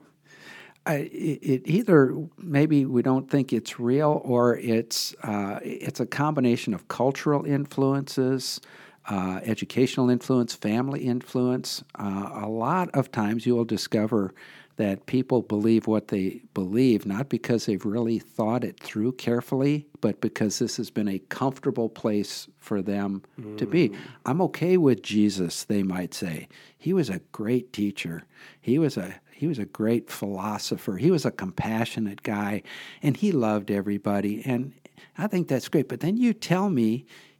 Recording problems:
none

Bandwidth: 18 kHz